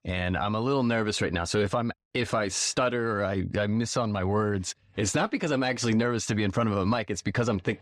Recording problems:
none

